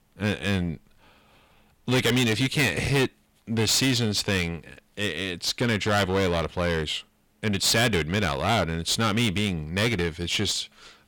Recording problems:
distortion; heavy; 11% of the sound clipped

